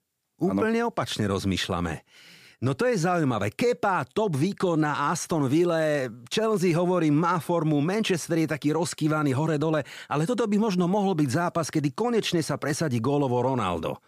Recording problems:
none

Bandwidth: 15 kHz